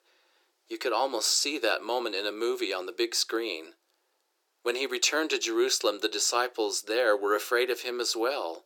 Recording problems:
thin; very; fading below 350 Hz

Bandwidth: 17.5 kHz